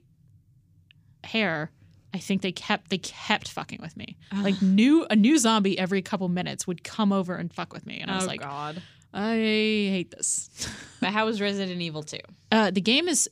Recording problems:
none

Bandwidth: 15 kHz